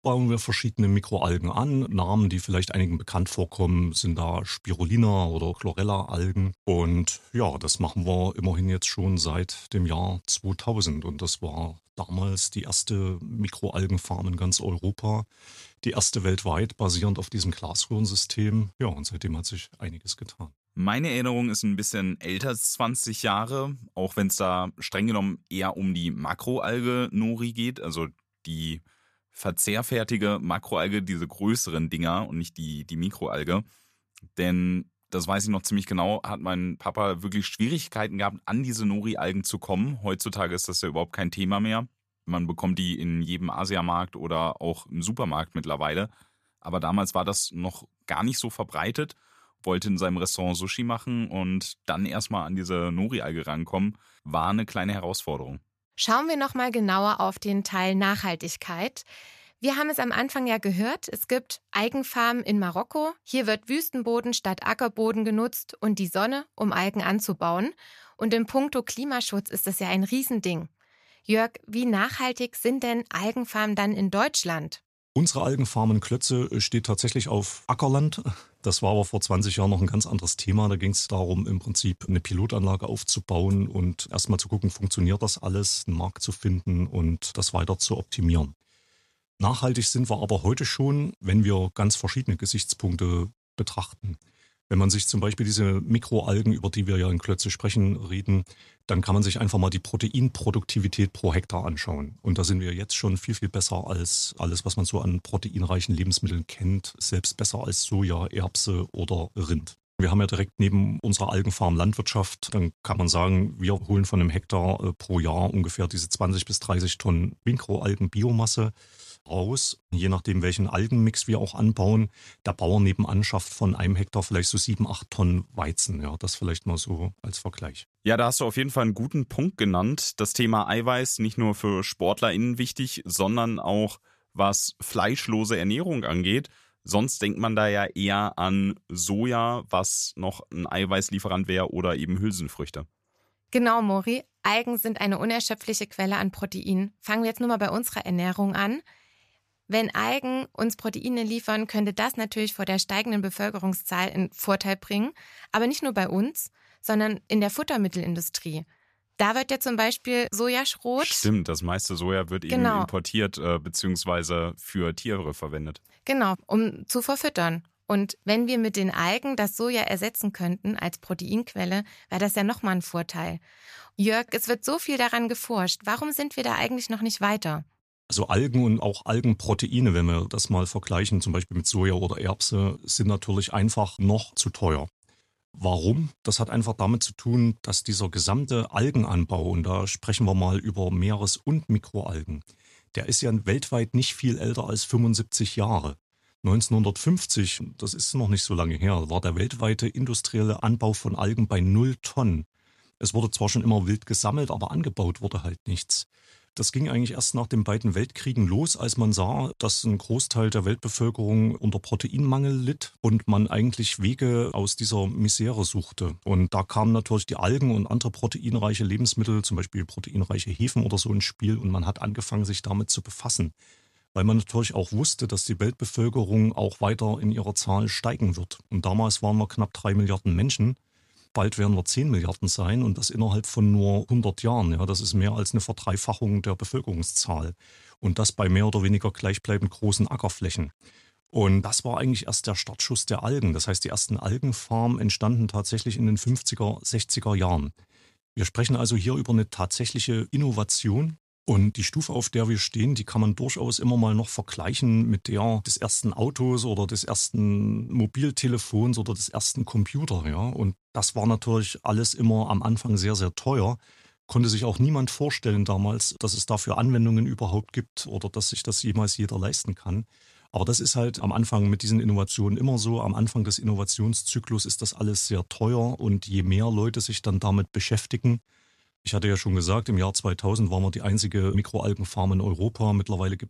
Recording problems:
none

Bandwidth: 14.5 kHz